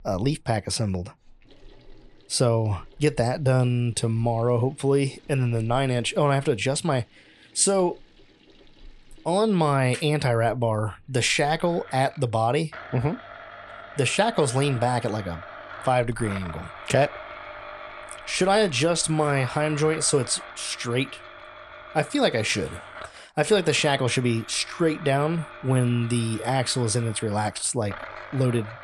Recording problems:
household noises; noticeable; throughout; 15 dB below the speech

